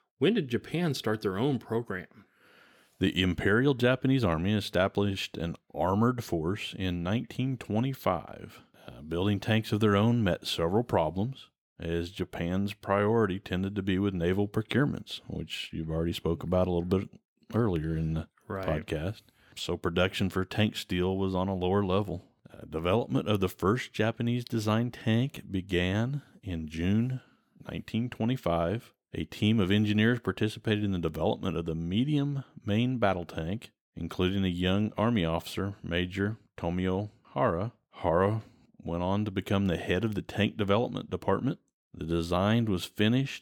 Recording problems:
none

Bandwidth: 18 kHz